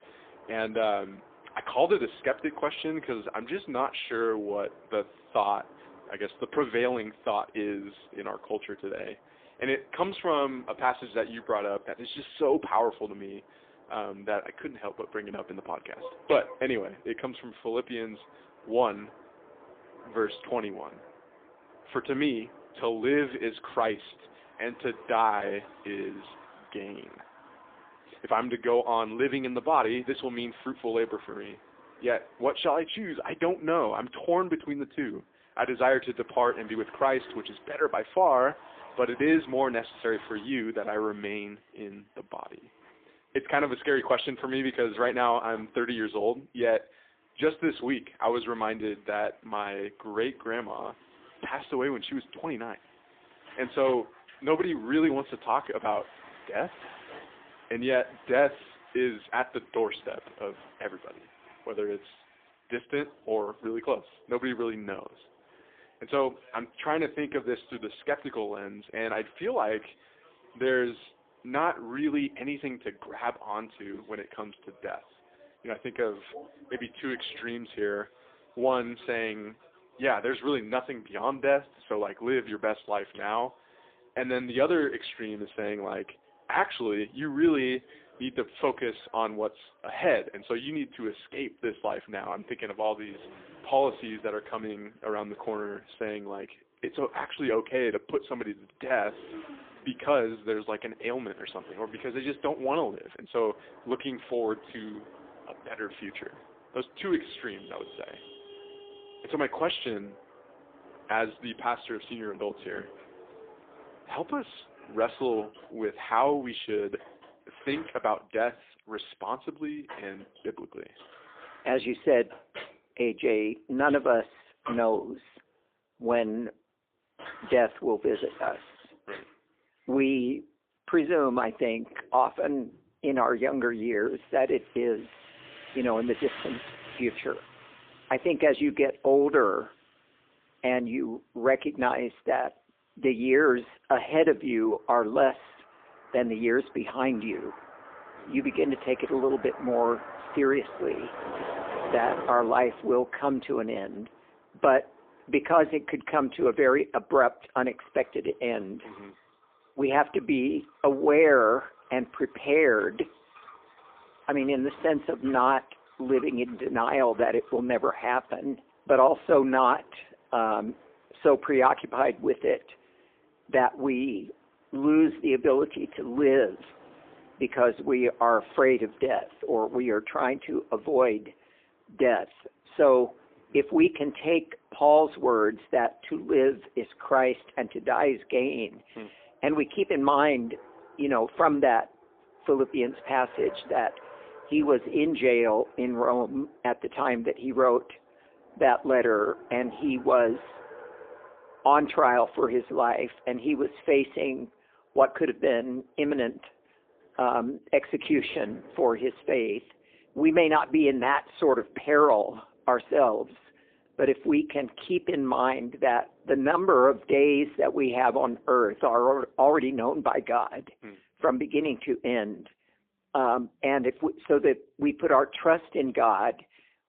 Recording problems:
phone-call audio; poor line
traffic noise; faint; throughout; 20 dB below the speech

